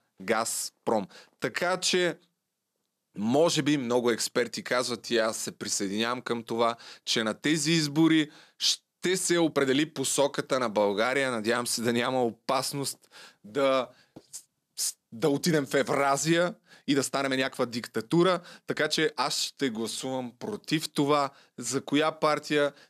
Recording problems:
uneven, jittery; strongly; from 1 to 21 s

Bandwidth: 14 kHz